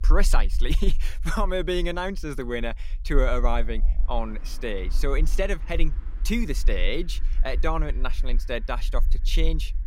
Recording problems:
traffic noise; faint; throughout; 25 dB below the speech
low rumble; faint; throughout; 25 dB below the speech

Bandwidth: 16 kHz